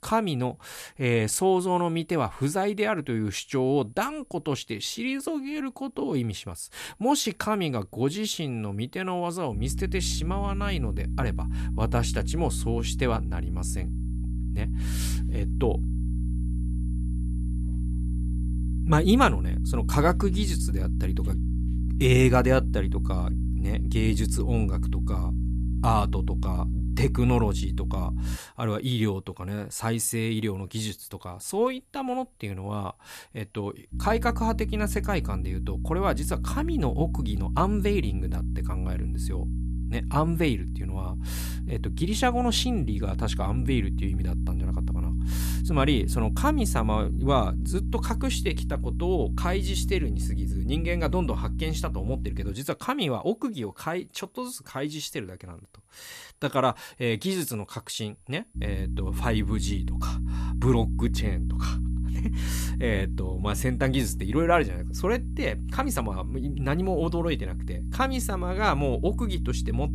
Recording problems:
electrical hum; noticeable; from 9.5 to 28 s, from 34 to 53 s and from 59 s on; 60 Hz, 15 dB below the speech
high-pitched whine; faint; throughout; 10 kHz, 35 dB below the speech

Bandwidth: 14.5 kHz